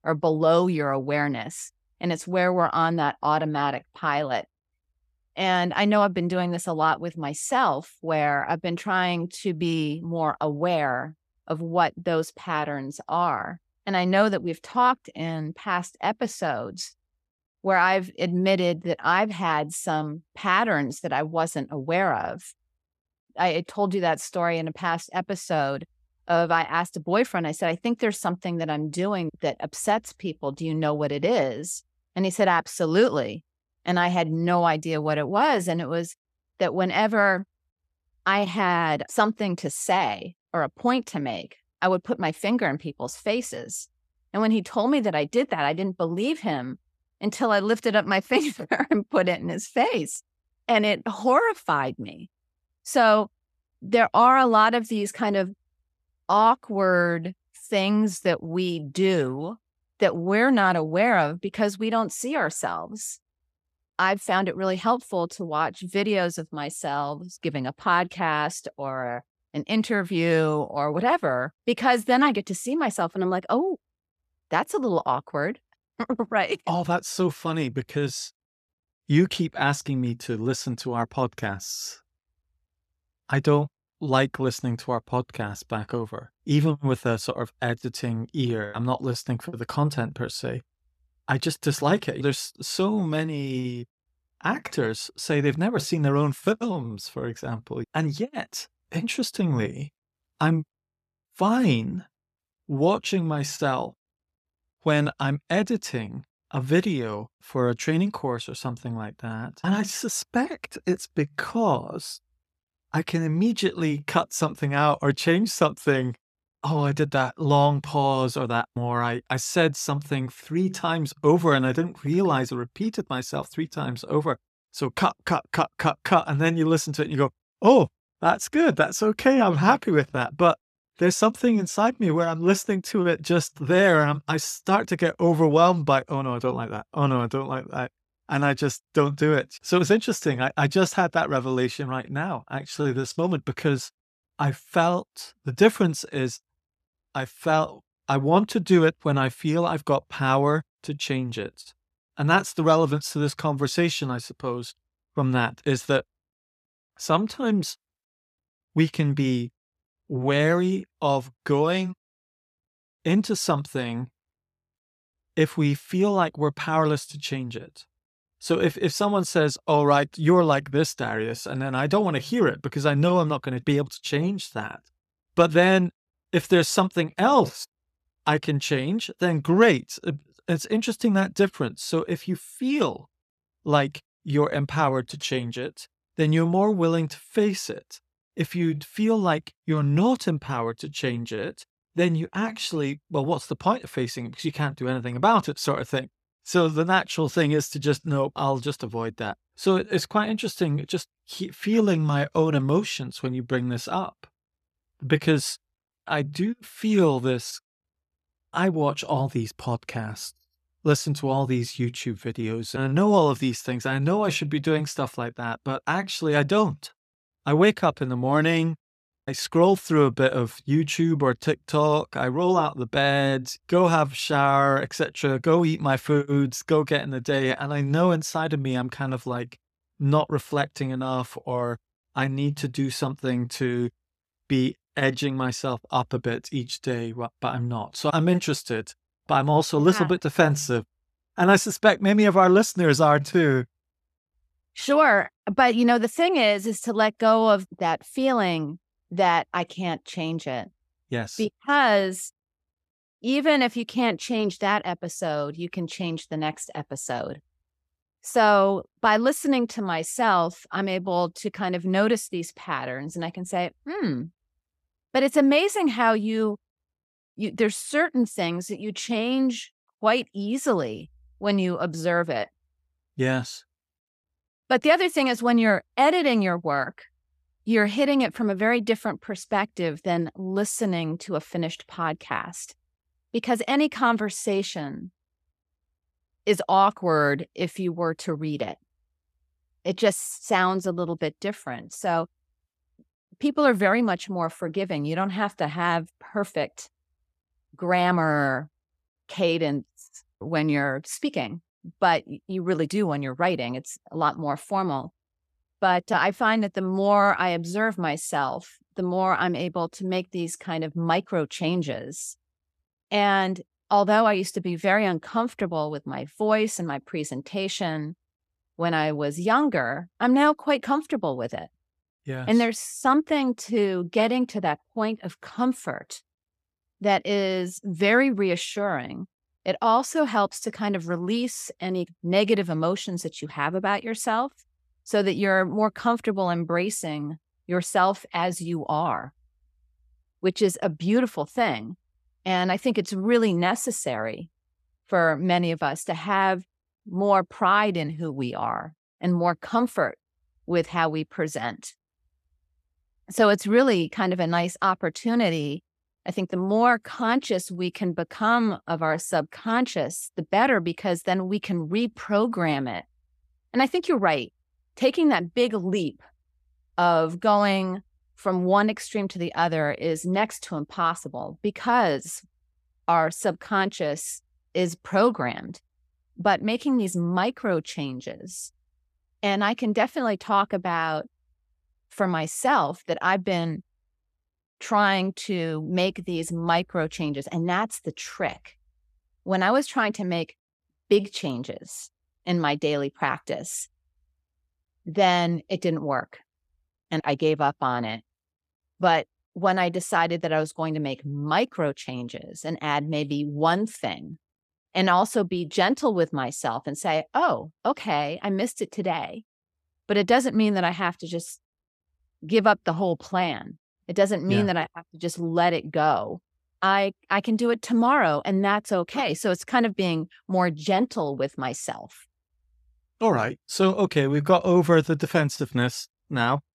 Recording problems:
none

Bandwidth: 14 kHz